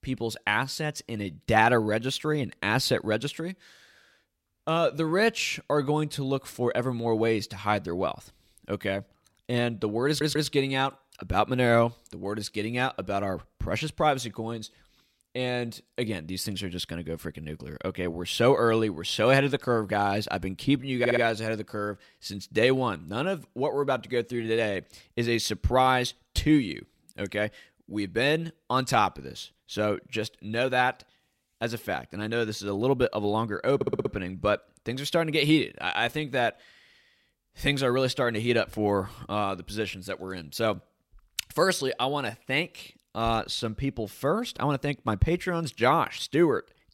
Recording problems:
audio stuttering; at 10 s, at 21 s and at 34 s

